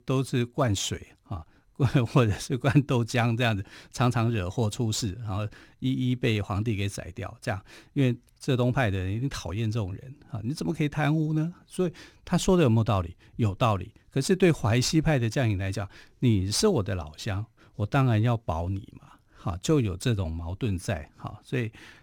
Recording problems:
none

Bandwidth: 18 kHz